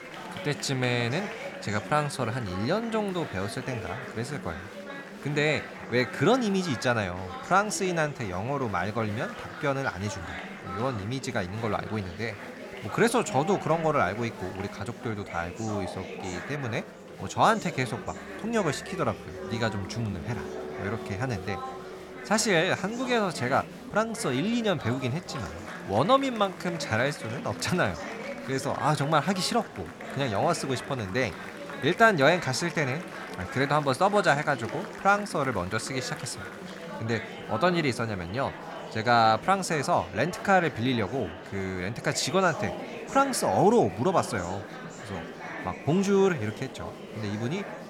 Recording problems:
murmuring crowd; noticeable; throughout; 10 dB below the speech

